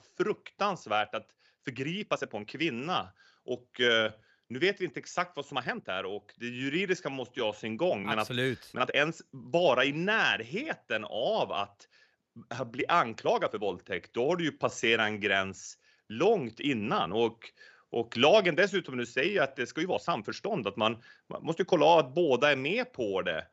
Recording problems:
uneven, jittery; strongly; from 1 to 22 s

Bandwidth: 13 kHz